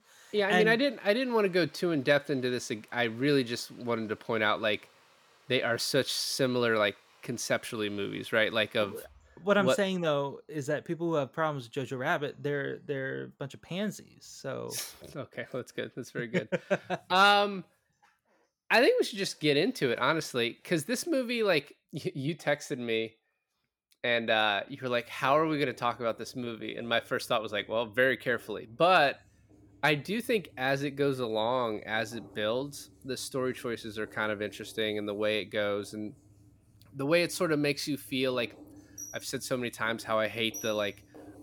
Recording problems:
household noises; faint; throughout; 25 dB below the speech

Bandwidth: 18.5 kHz